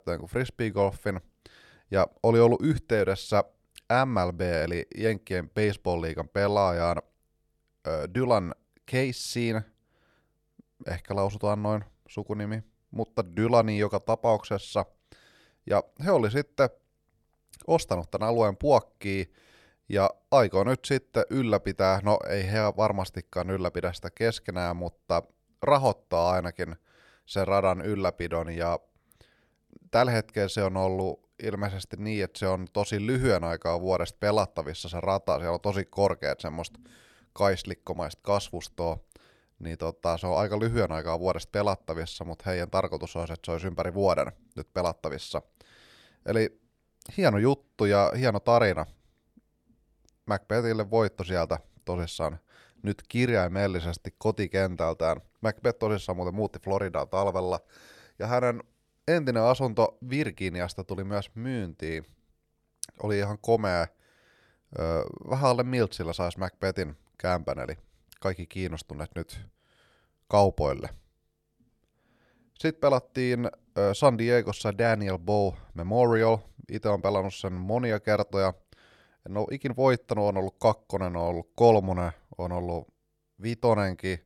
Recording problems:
none

